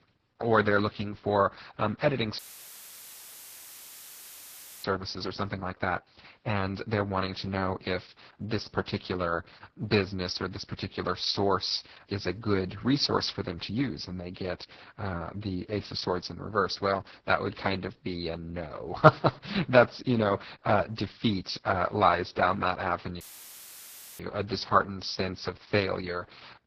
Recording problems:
garbled, watery; badly; nothing above 5.5 kHz
audio cutting out; filled with static; at 2.5 s for 2.5 s and at 23 s for 1 s

